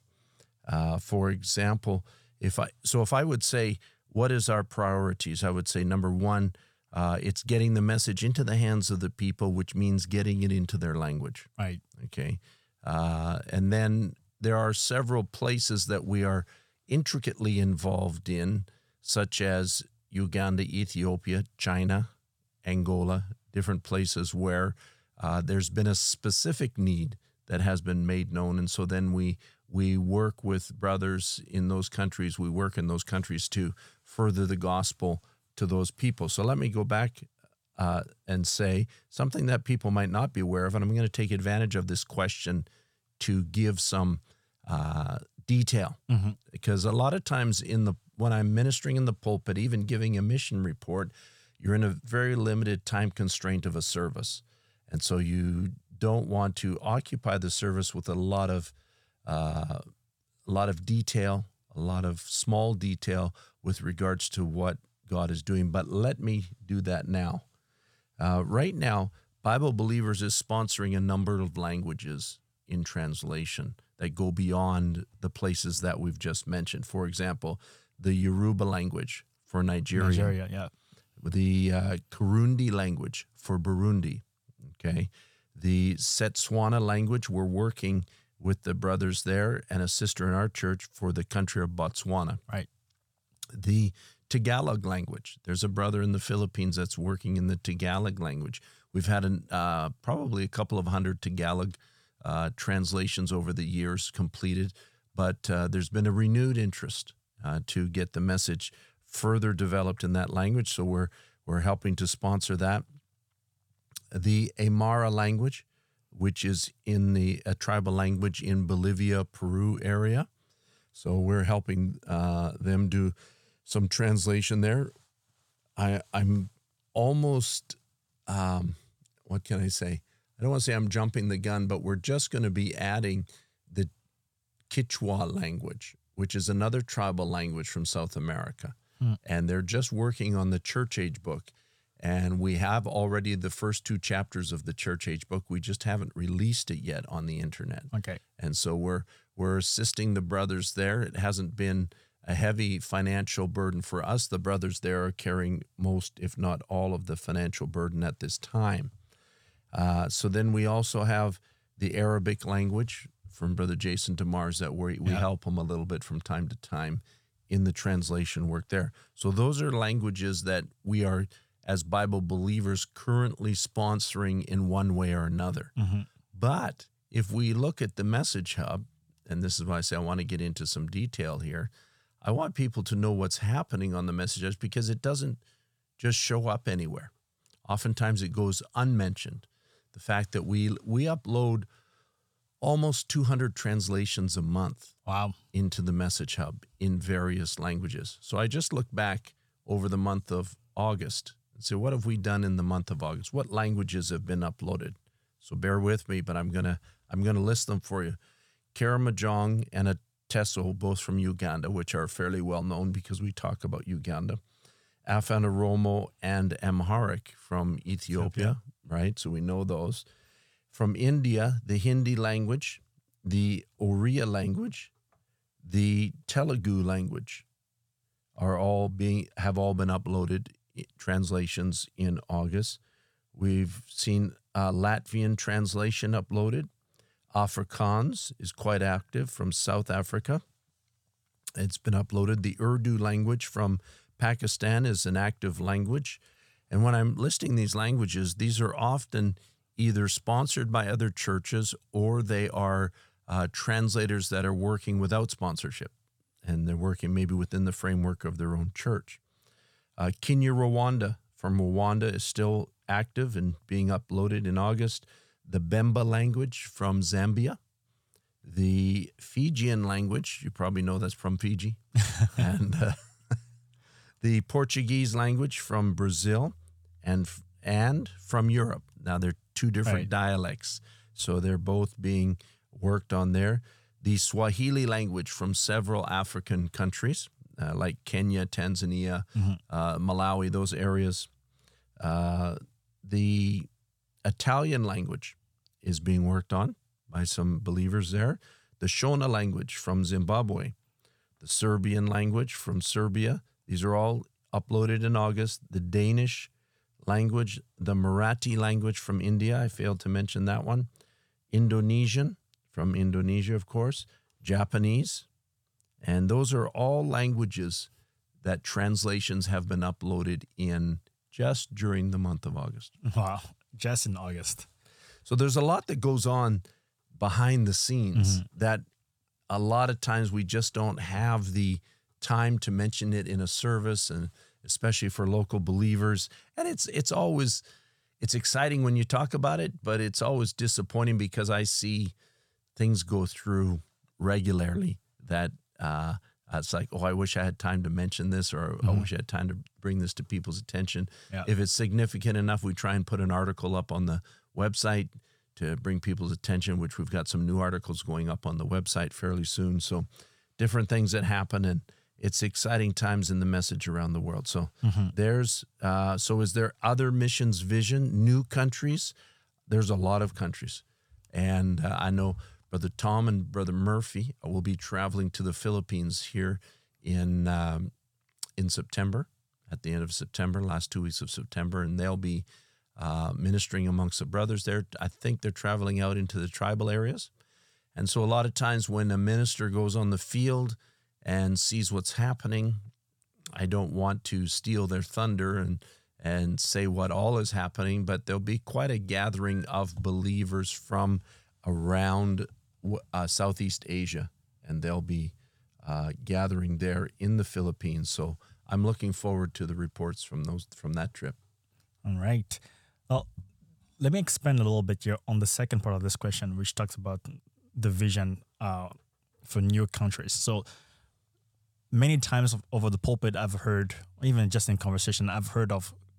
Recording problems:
none

